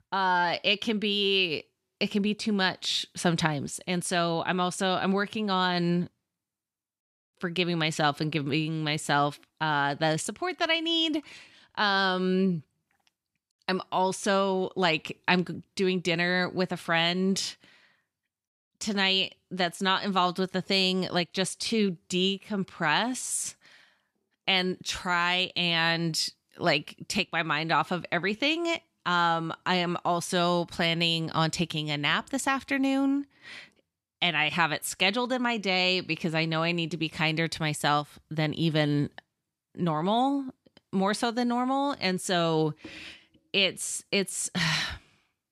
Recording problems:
none

